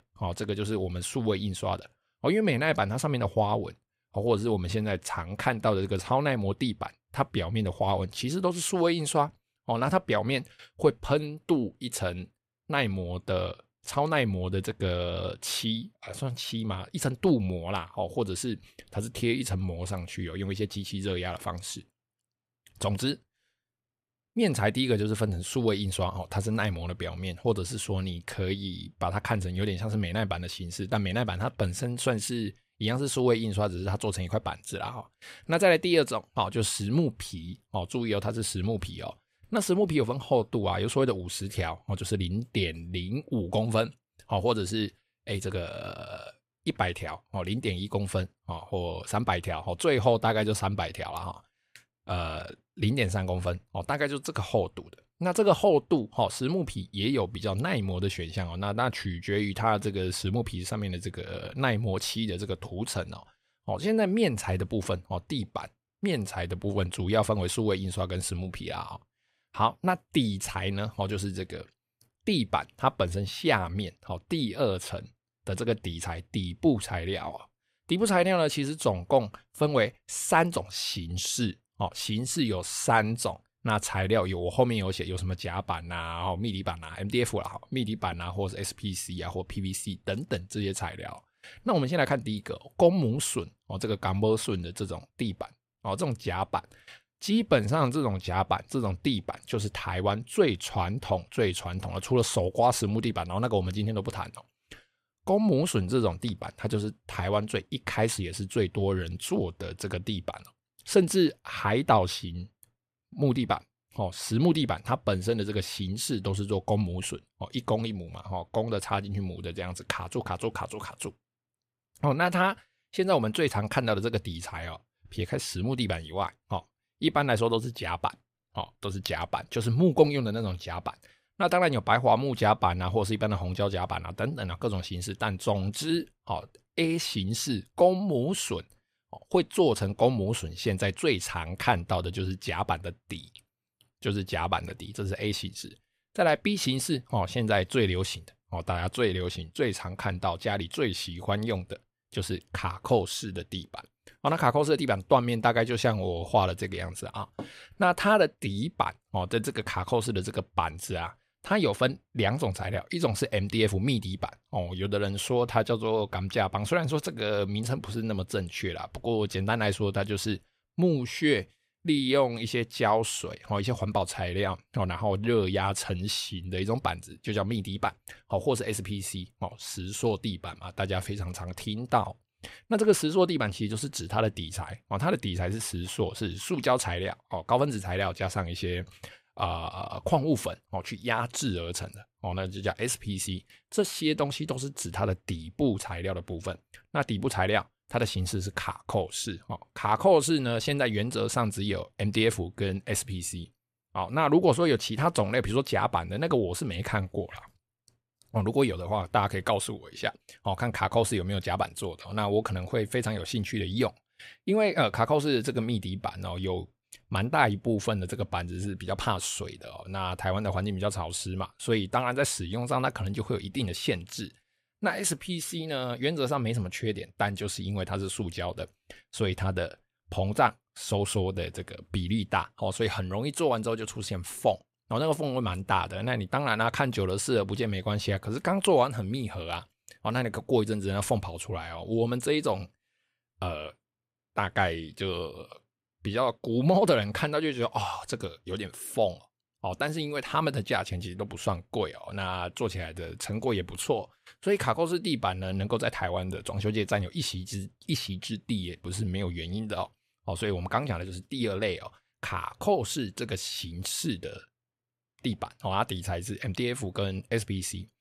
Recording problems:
none

